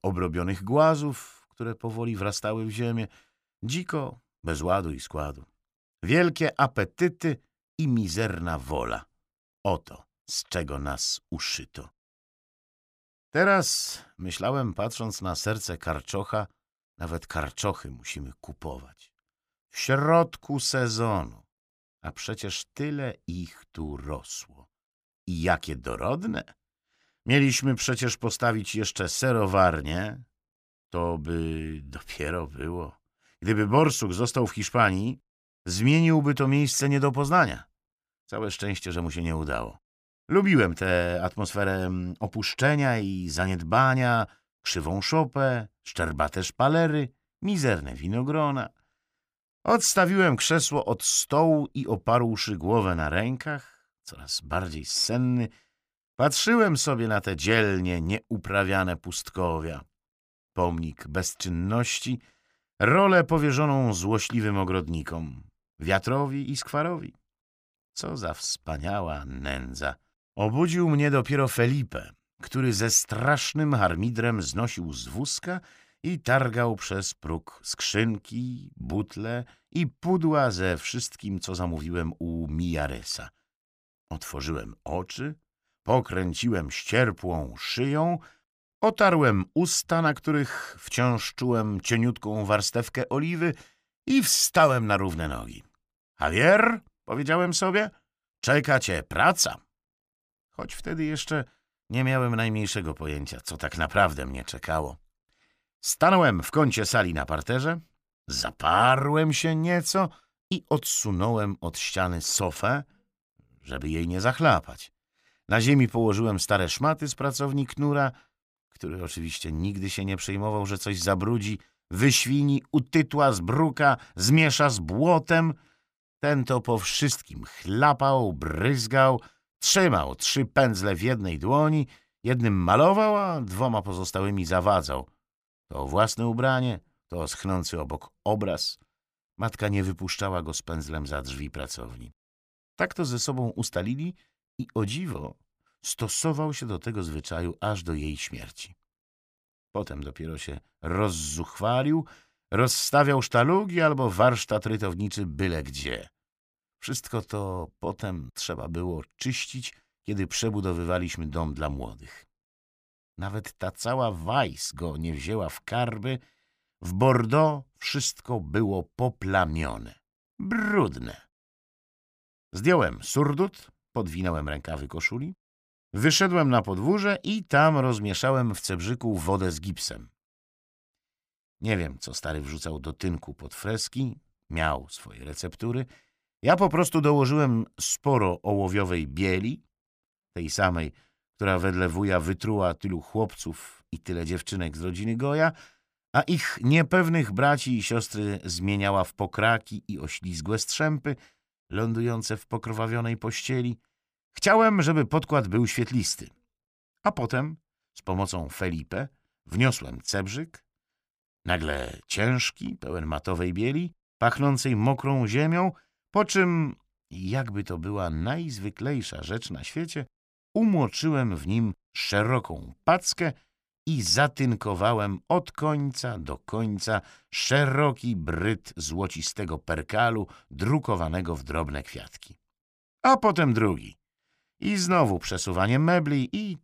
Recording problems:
none

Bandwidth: 15 kHz